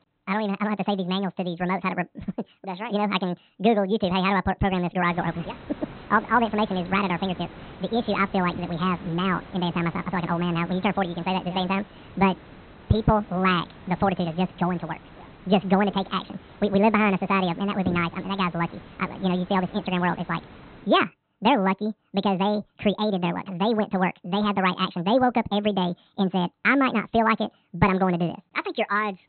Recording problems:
high frequencies cut off; severe; nothing above 4 kHz
wrong speed and pitch; too fast and too high; 1.6 times normal speed
hiss; faint; from 5 to 21 s; 20 dB below the speech

